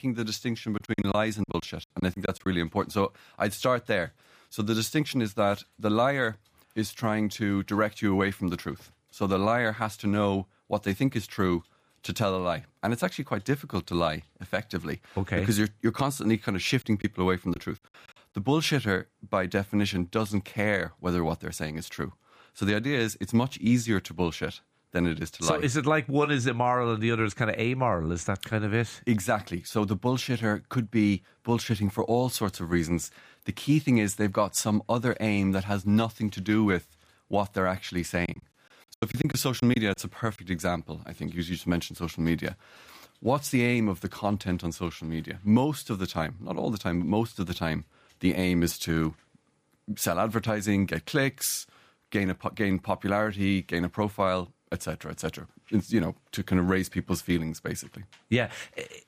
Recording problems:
choppy; very; from 1 to 2.5 s, at 17 s and from 38 to 40 s; 14% of the speech affected

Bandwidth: 15 kHz